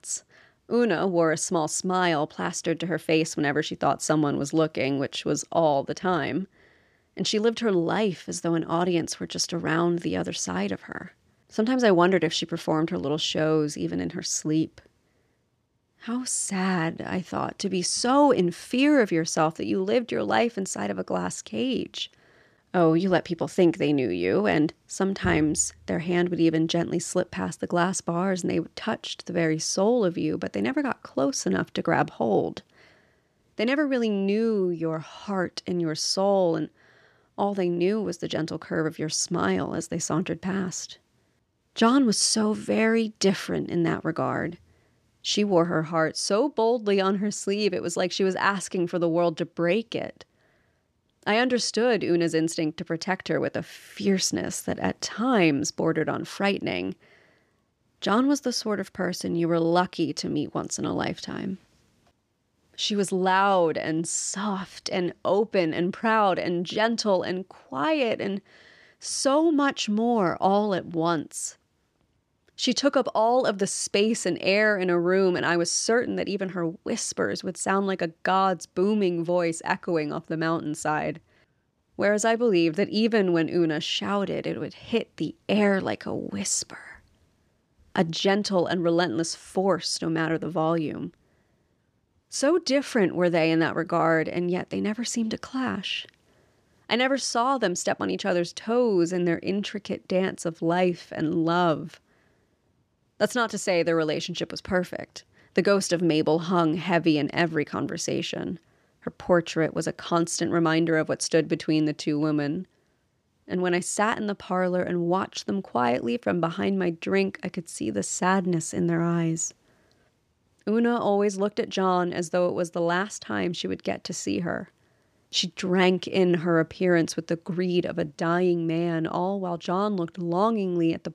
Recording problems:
none

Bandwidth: 15 kHz